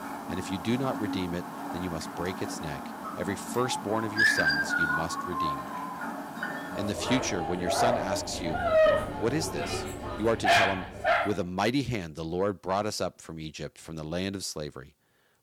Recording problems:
distortion; slight; 10 dB below the speech
animal sounds; very loud; until 11 s; 3 dB above the speech

